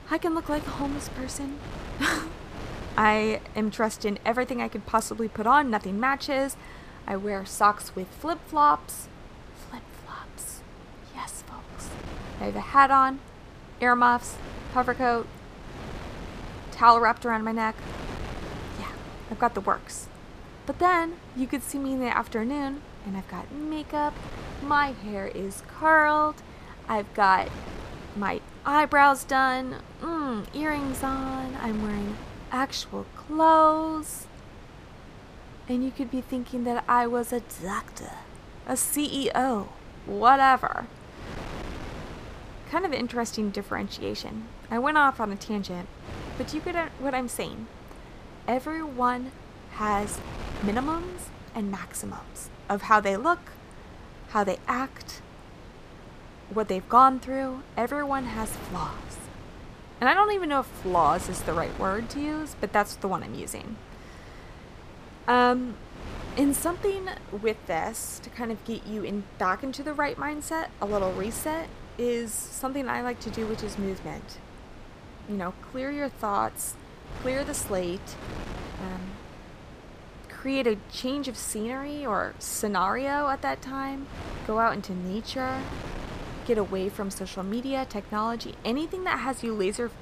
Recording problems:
wind noise on the microphone; occasional gusts; 20 dB below the speech

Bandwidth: 14.5 kHz